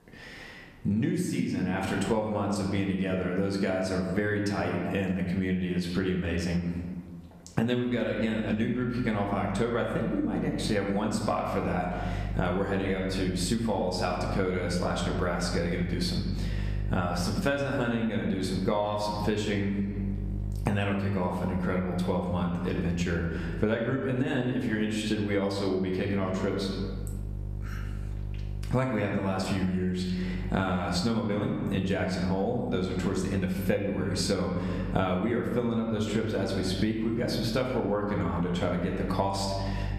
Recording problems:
room echo; noticeable; dies away in 1 s
off-mic speech; somewhat distant
squashed, flat; somewhat
electrical hum; faint; from 8 s on; 50 Hz, 25 dB below the speech

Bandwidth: 14.5 kHz